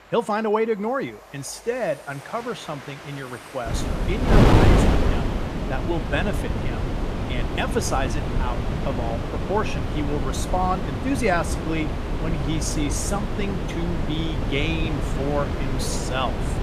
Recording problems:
wind noise on the microphone; heavy; from 3.5 s on; 2 dB below the speech
train or aircraft noise; noticeable; throughout; 15 dB below the speech

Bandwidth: 15 kHz